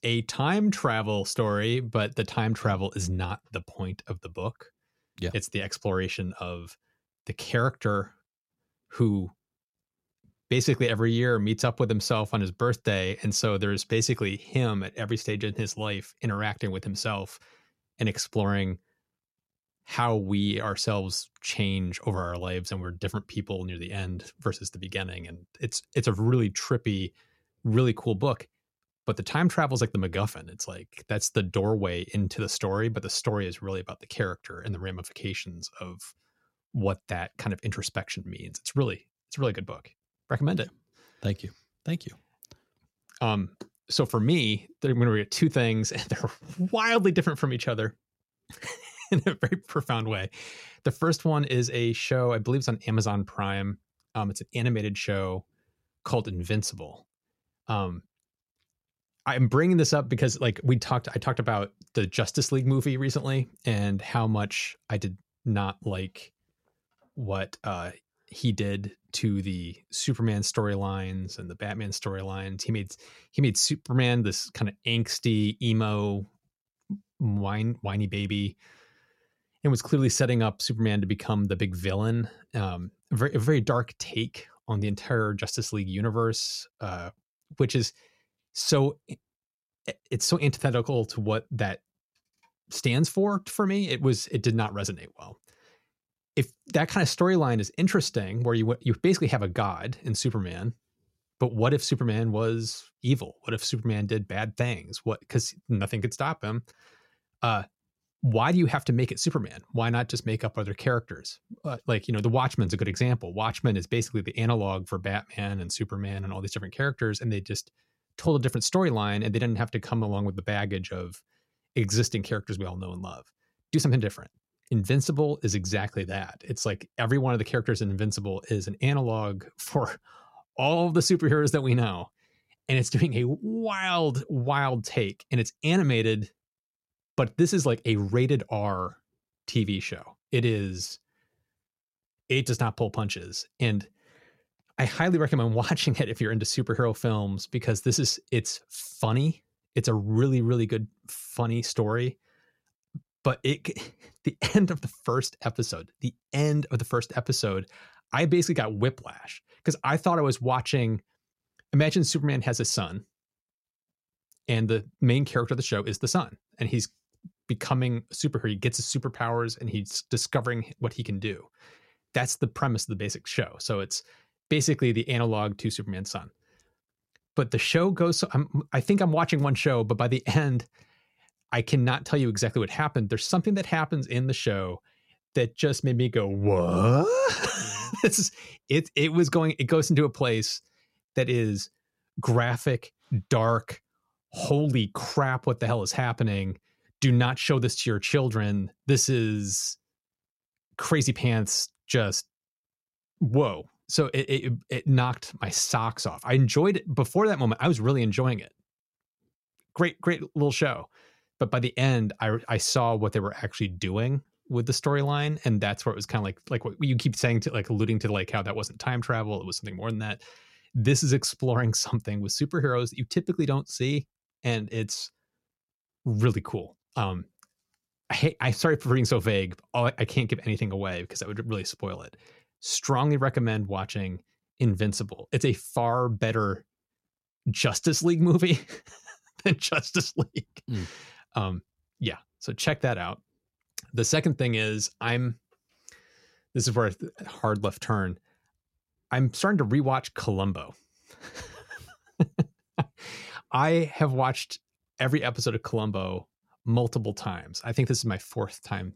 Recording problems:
none

